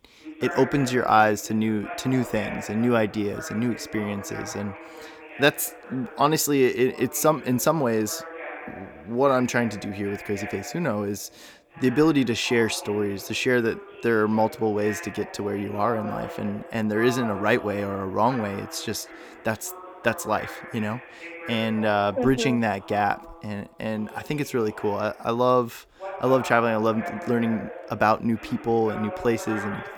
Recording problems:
voice in the background; noticeable; throughout; 15 dB below the speech

